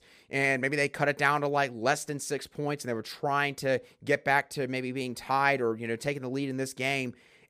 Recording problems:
none

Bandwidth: 15 kHz